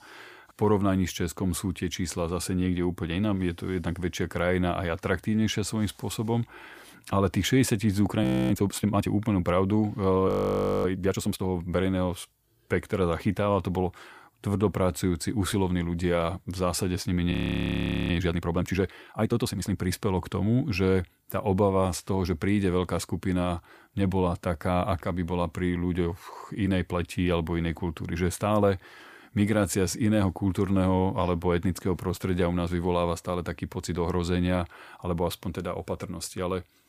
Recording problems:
audio freezing; at 8 s, at 10 s for 0.5 s and at 17 s for 1 s

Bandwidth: 15 kHz